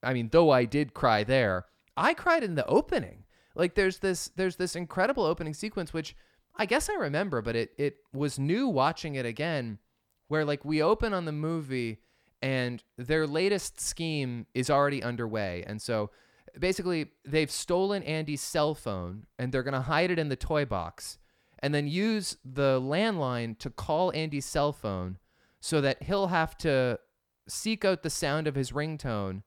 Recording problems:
none

